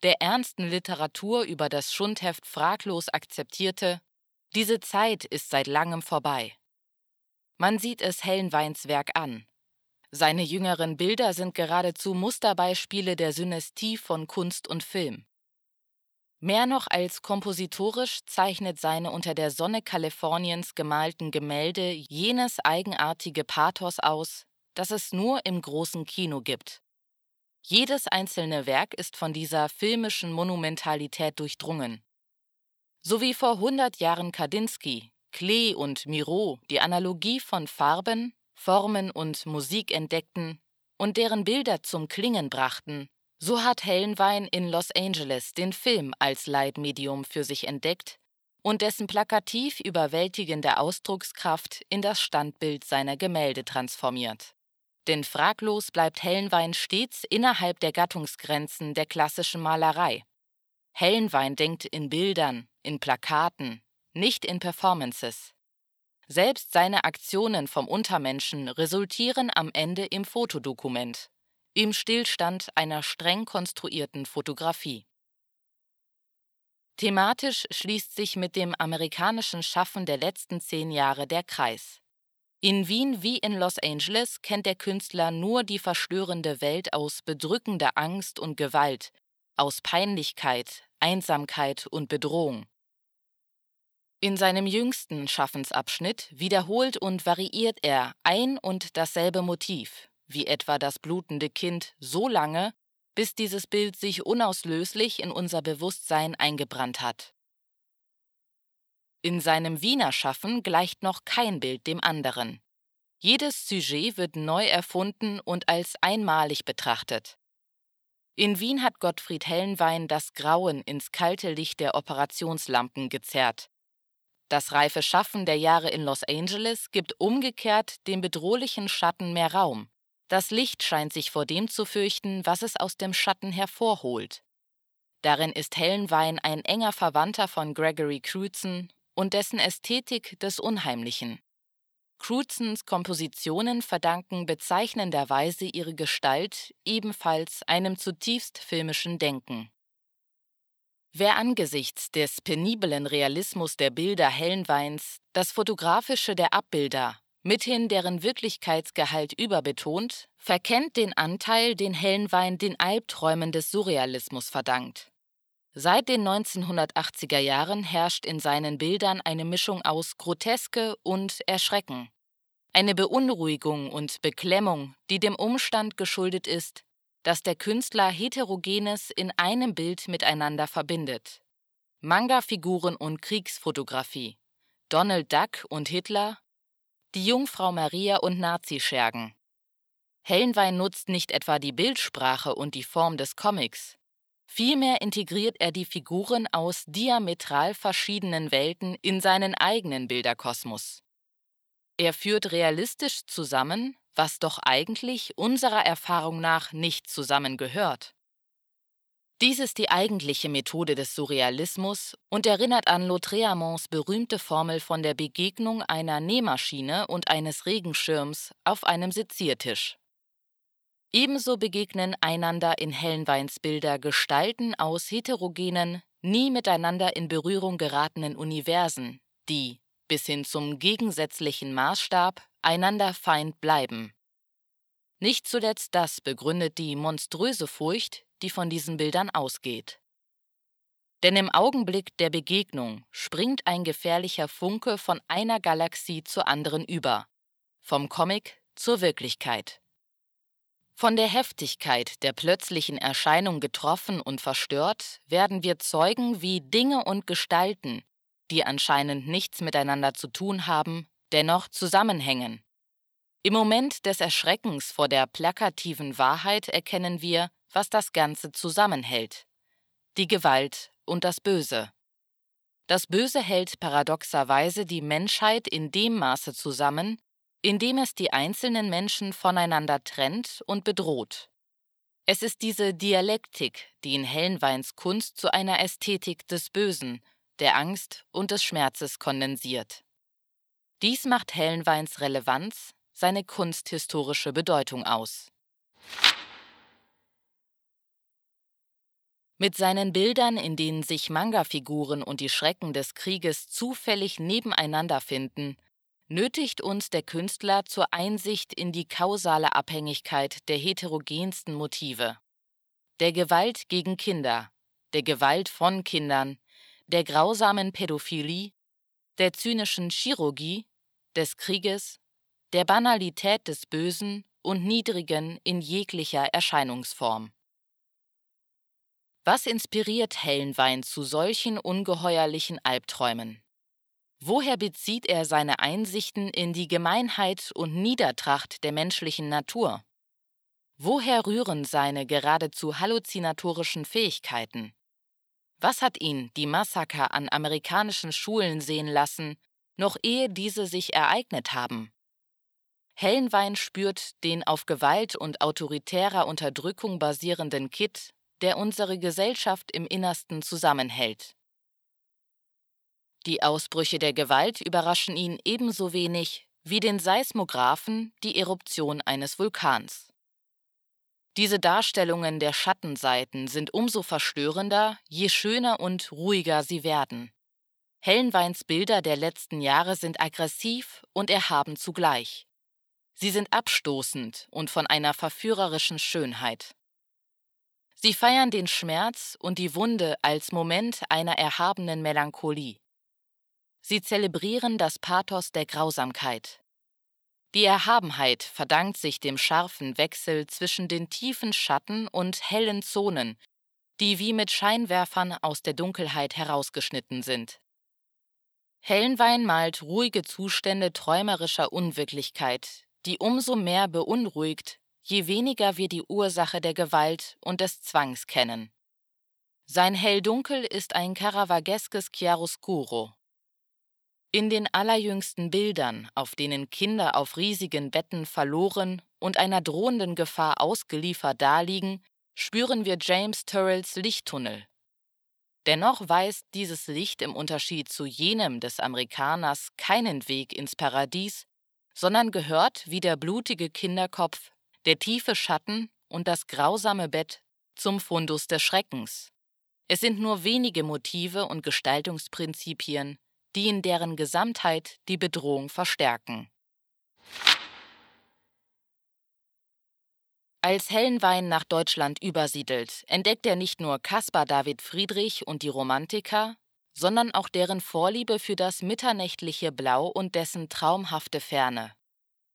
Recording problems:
thin; very slightly; fading below 500 Hz

